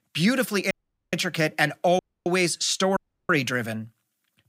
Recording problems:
audio cutting out; at 0.5 s, at 2 s and at 3 s

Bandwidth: 15.5 kHz